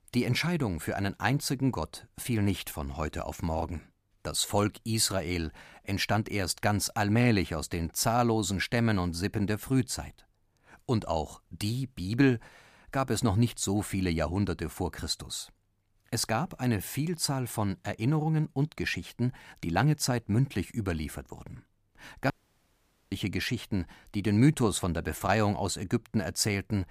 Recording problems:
audio cutting out; at 22 s for 1 s

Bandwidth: 15 kHz